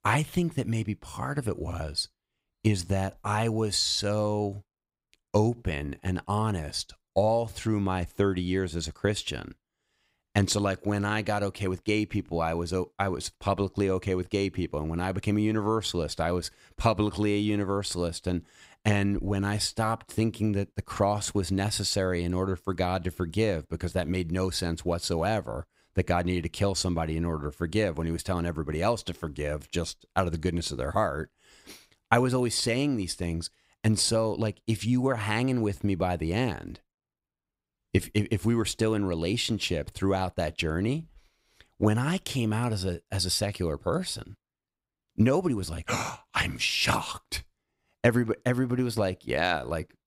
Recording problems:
none

